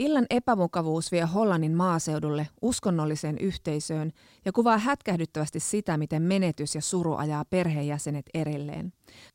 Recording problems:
abrupt cut into speech; at the start

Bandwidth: 16 kHz